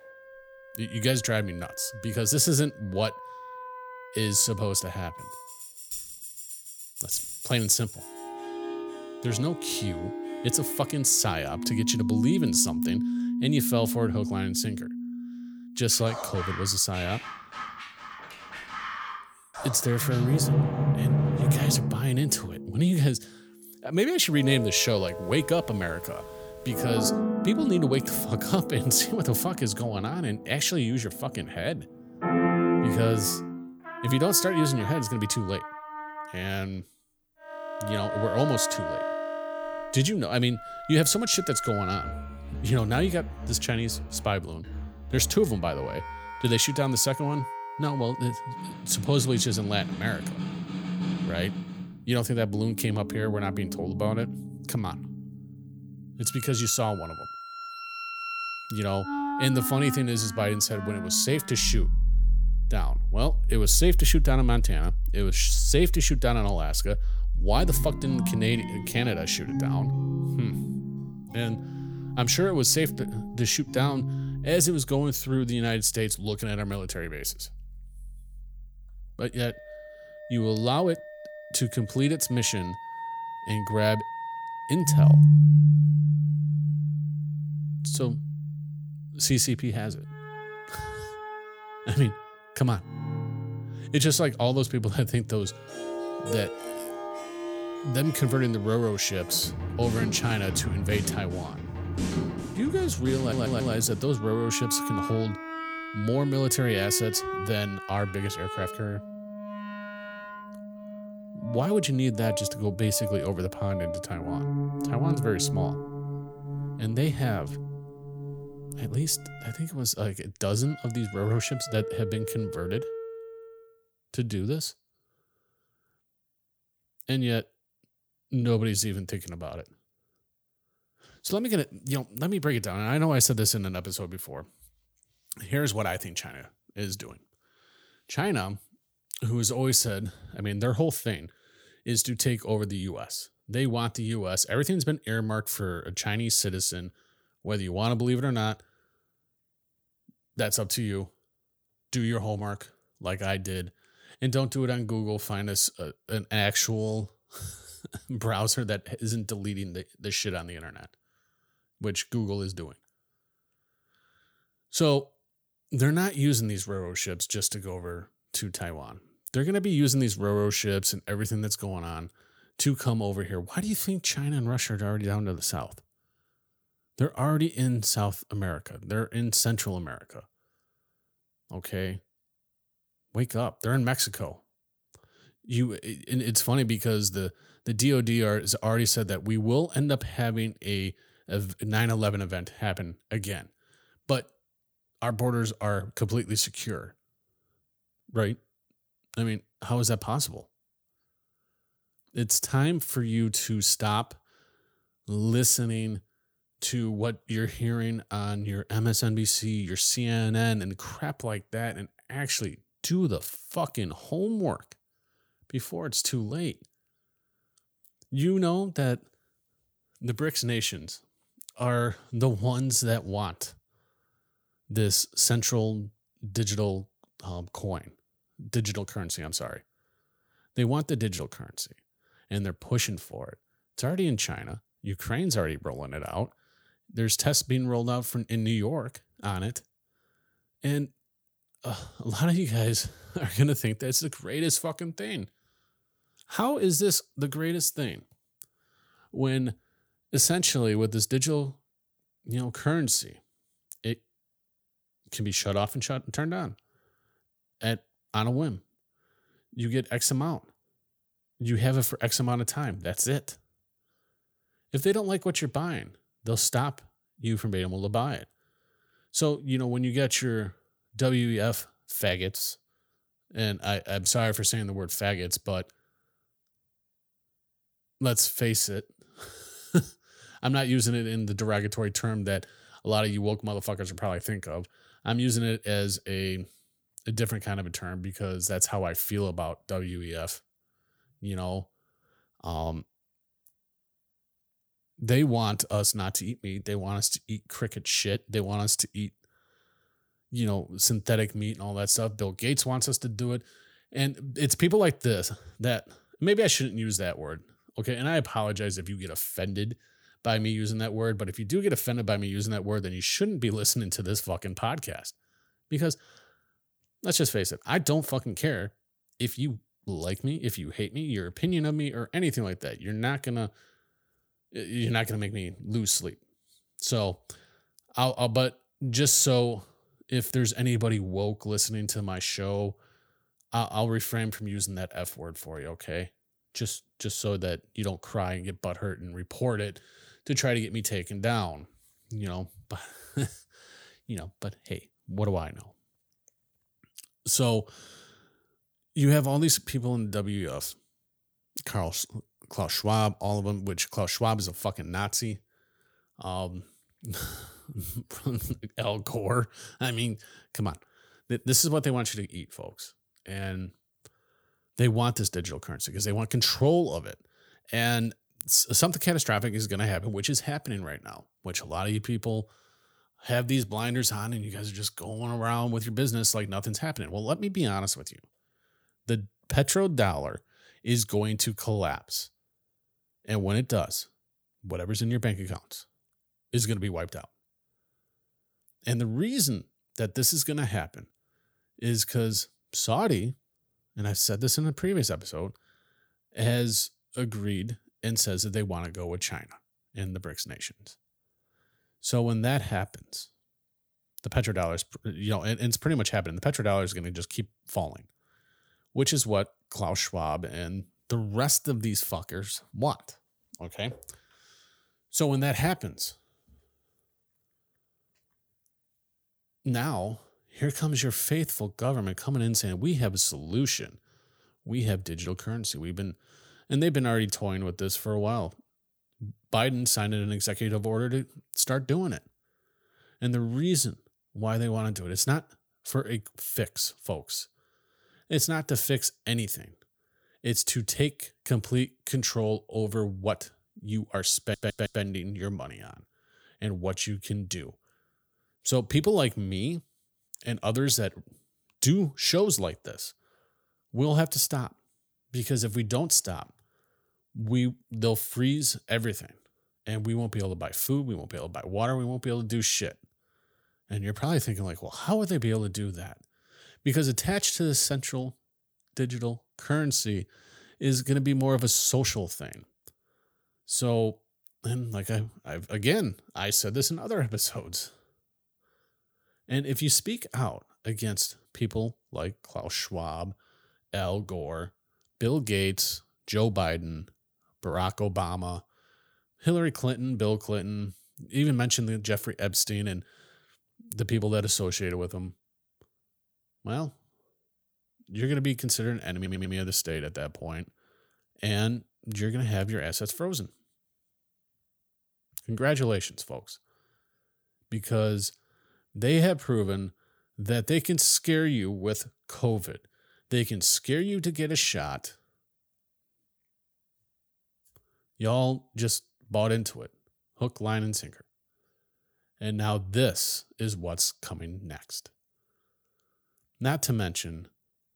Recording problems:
background music; loud; until 2:03; 3 dB below the speech
audio stuttering; at 1:43, at 7:24 and at 8:19

